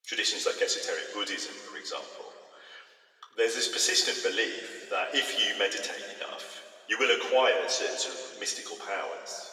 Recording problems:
thin; very; fading below 500 Hz
room echo; noticeable; dies away in 2.1 s
off-mic speech; somewhat distant

